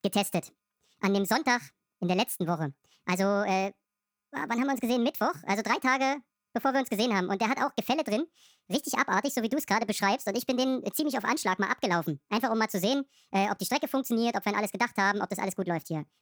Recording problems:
wrong speed and pitch; too fast and too high; 1.5 times normal speed

